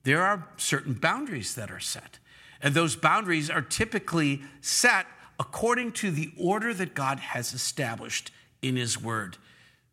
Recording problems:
none

